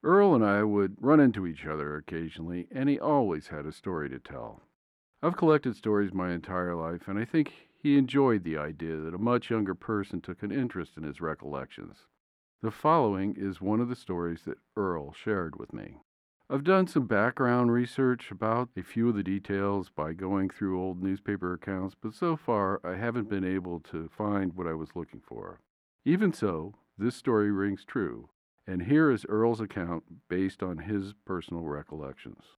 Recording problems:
muffled; slightly; fading above 3 kHz

